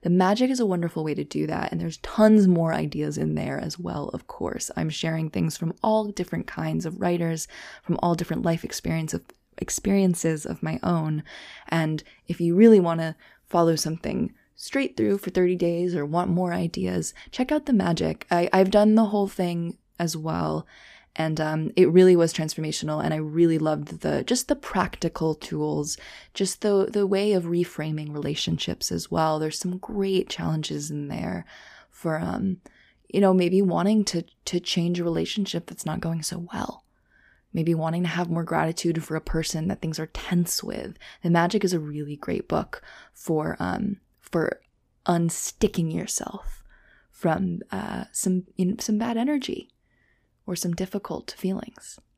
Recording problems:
none

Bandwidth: 15 kHz